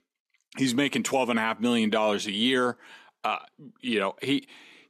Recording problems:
none

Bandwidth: 13.5 kHz